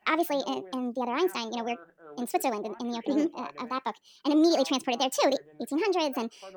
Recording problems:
wrong speed and pitch; too fast and too high; 1.5 times normal speed
voice in the background; faint; throughout; 20 dB below the speech

